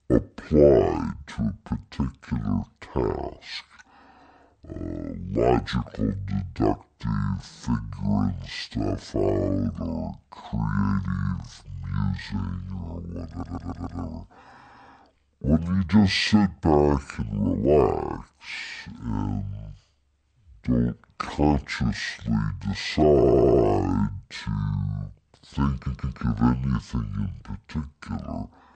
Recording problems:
wrong speed and pitch; too slow and too low; 0.6 times normal speed
audio stuttering; at 13 s, at 23 s and at 26 s

